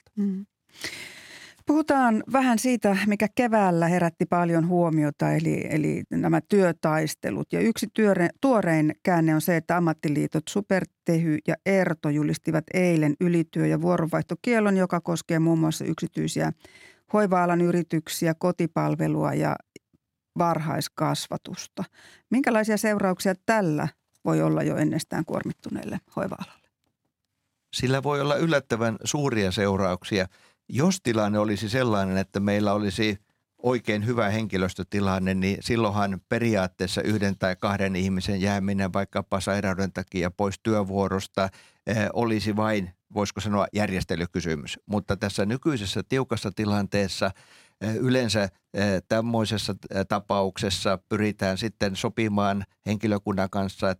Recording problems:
none

